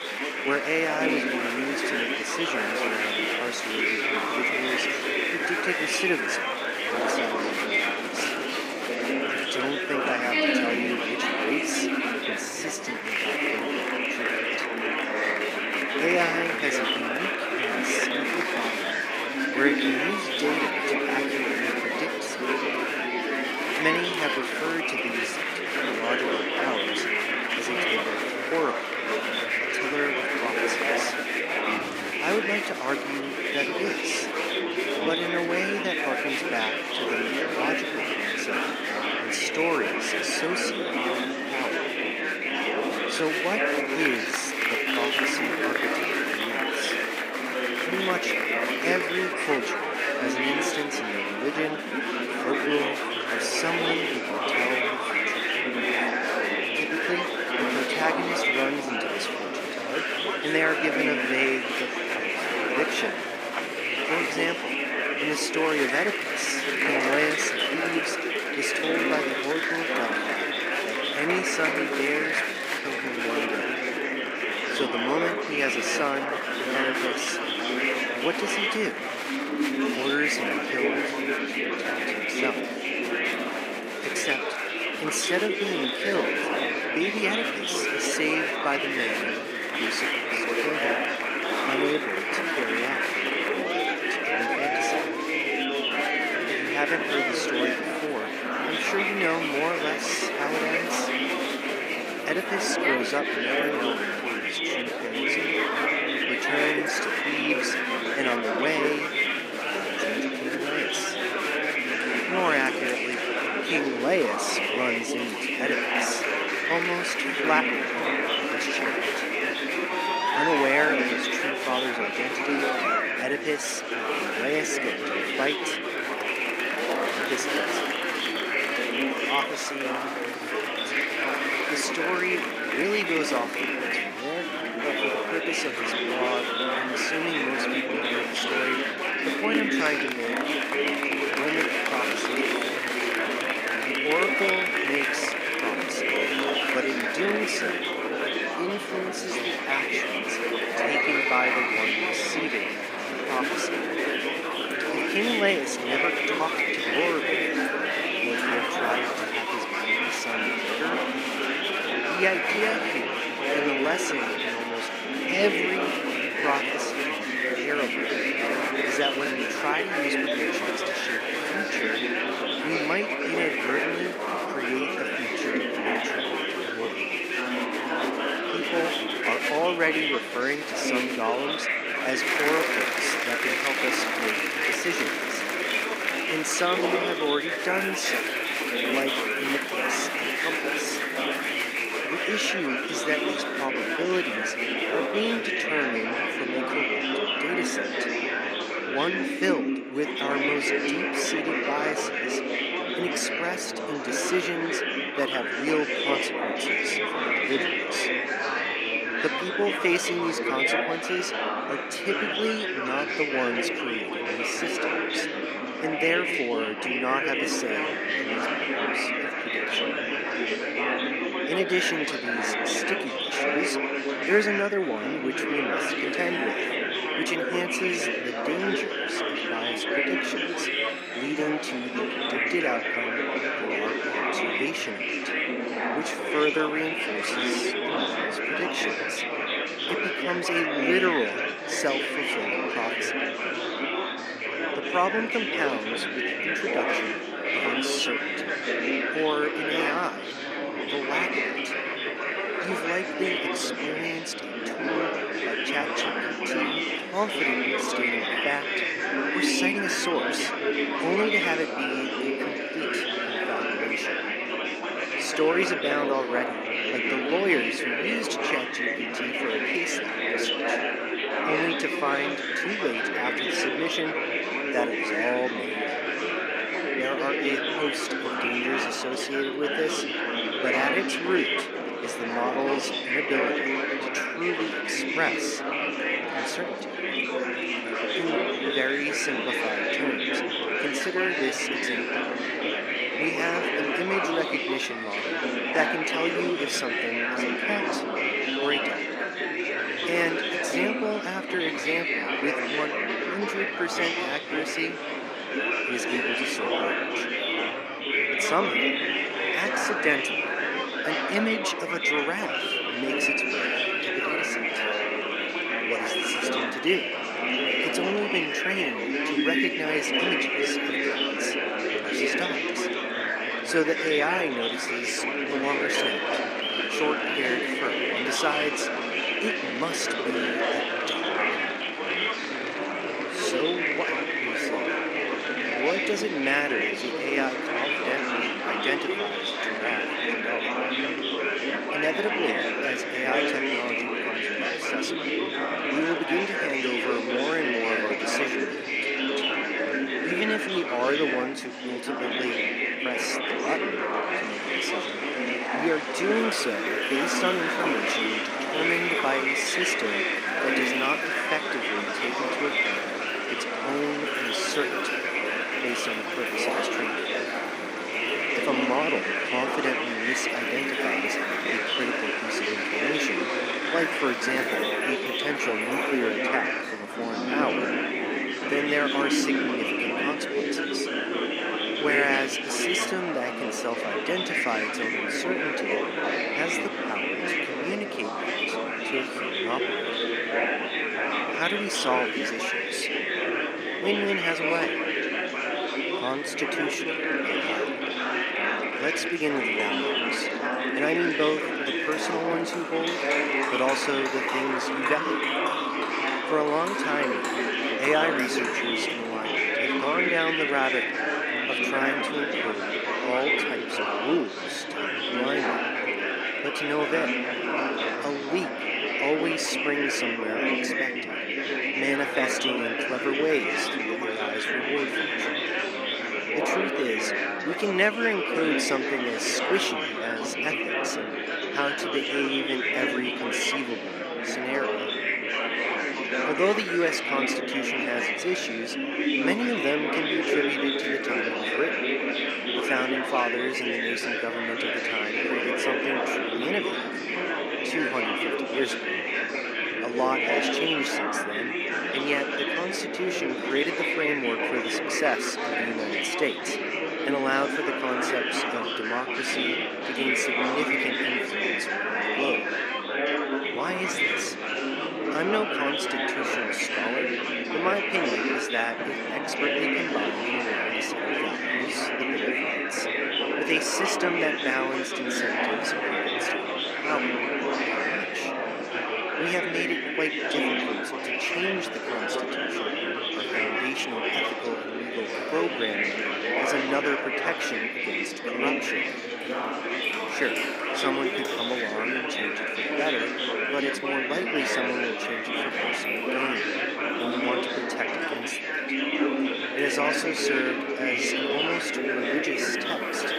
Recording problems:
thin; somewhat; fading below 250 Hz
murmuring crowd; very loud; throughout; 4 dB above the speech
animal sounds; loud; throughout; 7 dB below the speech
rain or running water; noticeable; throughout; 10 dB below the speech

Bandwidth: 15.5 kHz